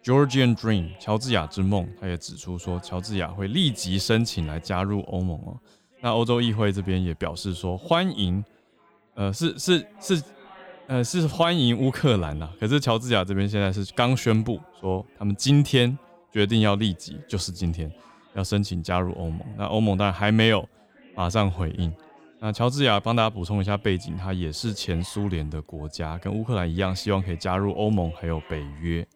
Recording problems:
chatter from many people; faint; throughout; 25 dB below the speech

